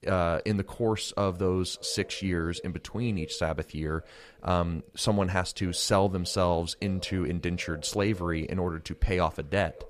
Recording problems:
echo of what is said; faint; throughout; 580 ms later, 20 dB below the speech

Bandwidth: 14.5 kHz